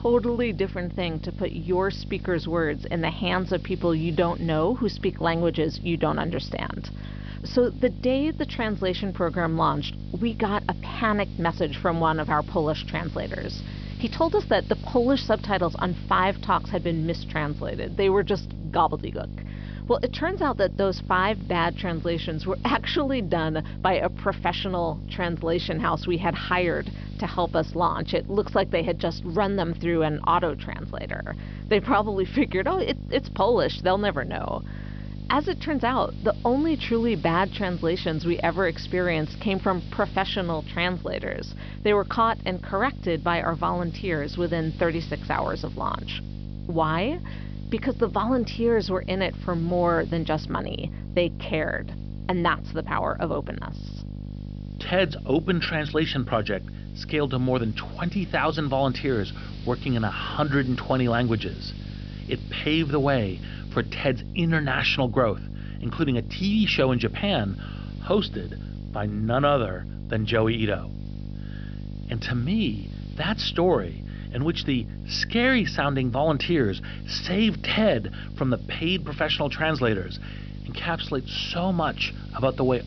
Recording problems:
high frequencies cut off; noticeable; nothing above 5.5 kHz
electrical hum; faint; throughout; 50 Hz, 20 dB below the speech
hiss; faint; throughout; 25 dB below the speech

